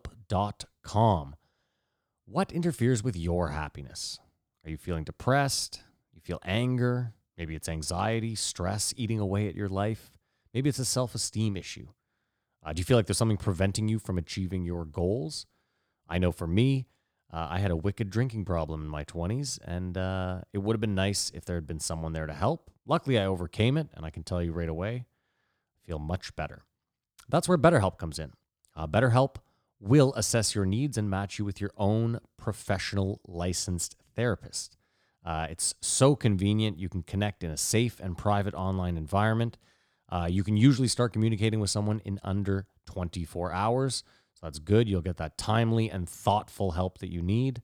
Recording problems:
none

